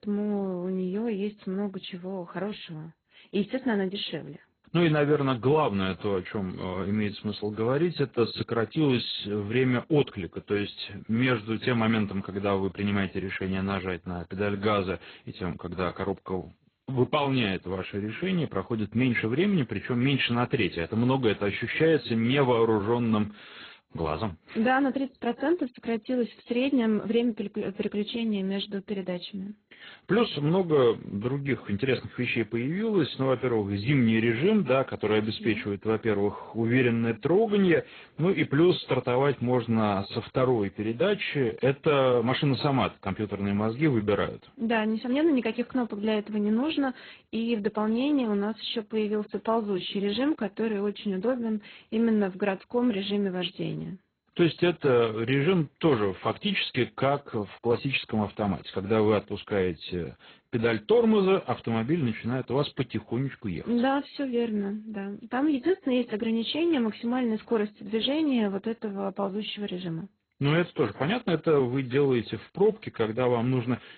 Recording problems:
garbled, watery; badly; nothing above 4 kHz

